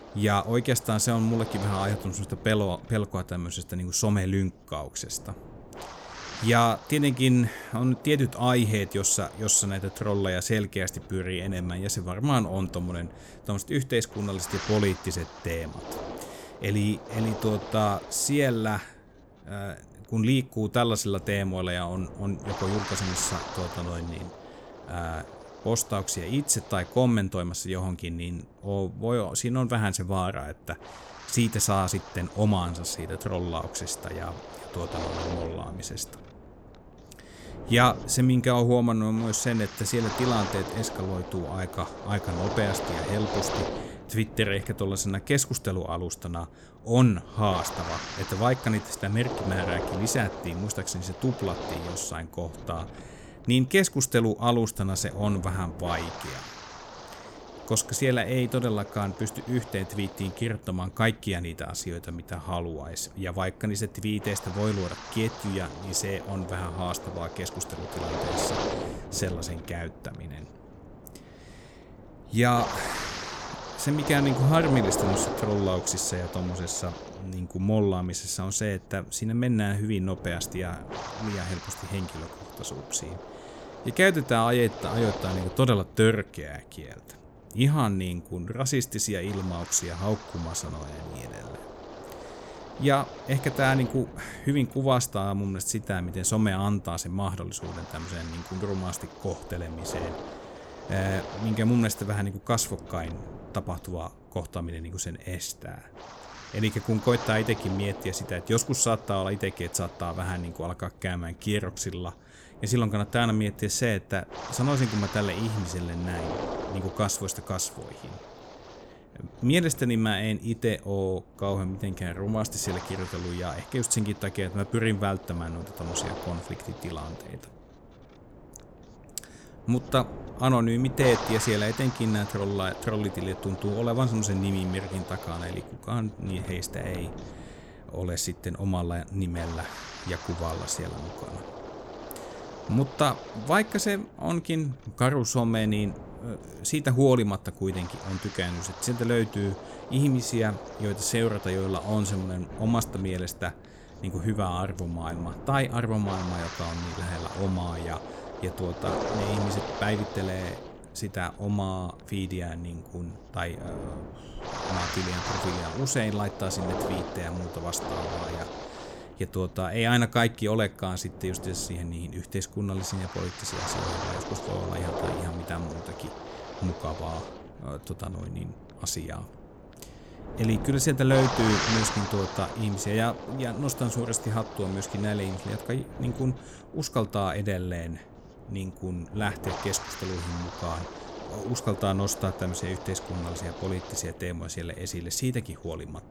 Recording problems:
wind noise on the microphone; heavy; 7 dB below the speech

